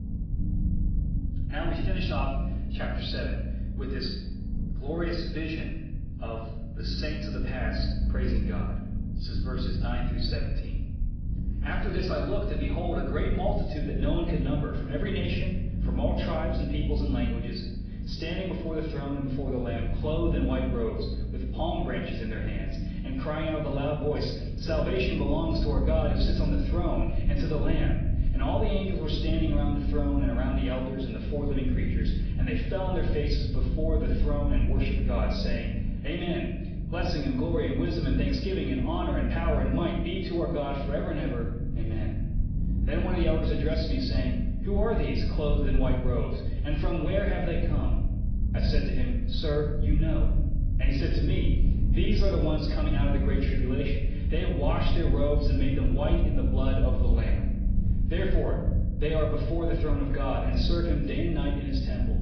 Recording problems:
off-mic speech; far
garbled, watery; badly
room echo; noticeable; dies away in 0.7 s
high frequencies cut off; noticeable; nothing above 5 kHz
low rumble; noticeable; throughout; 10 dB below the speech

